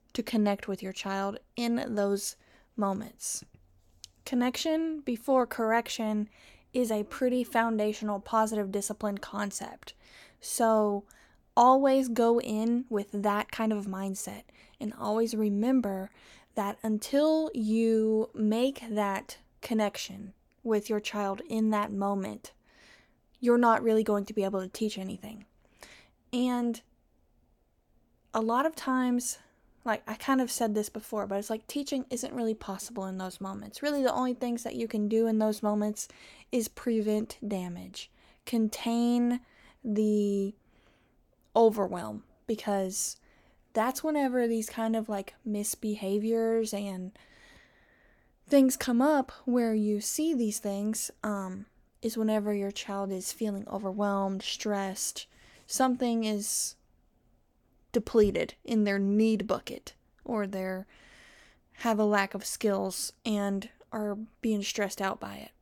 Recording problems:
none

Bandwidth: 18 kHz